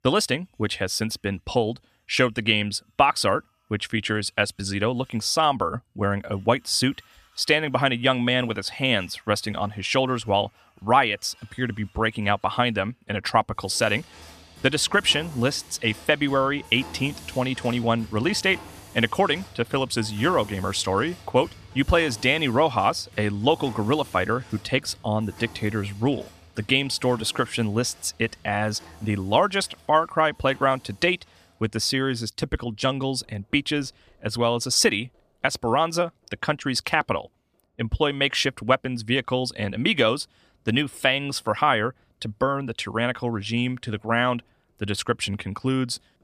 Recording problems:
machinery noise; faint; throughout; 20 dB below the speech

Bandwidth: 14.5 kHz